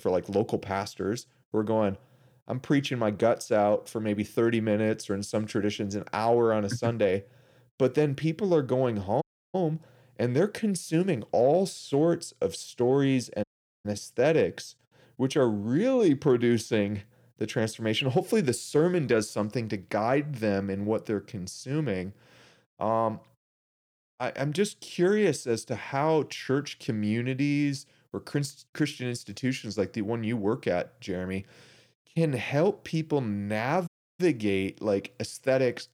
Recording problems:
audio cutting out; at 9 s, at 13 s and at 34 s

